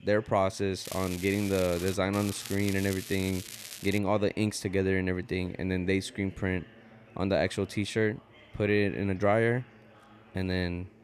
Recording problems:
crackling; noticeable; from 1 to 2 s and from 2 to 4 s; 10 dB below the speech
chatter from many people; faint; throughout; 25 dB below the speech

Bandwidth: 13.5 kHz